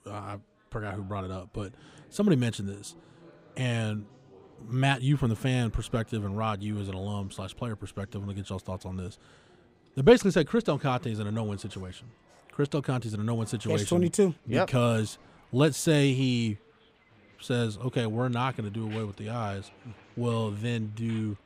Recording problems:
chatter from many people; faint; throughout; 30 dB below the speech

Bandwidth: 15.5 kHz